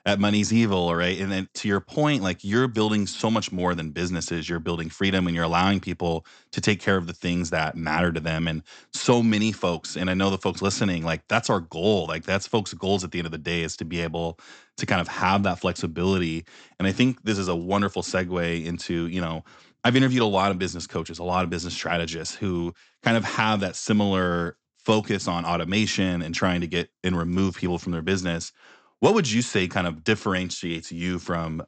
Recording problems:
high frequencies cut off; noticeable; nothing above 8 kHz

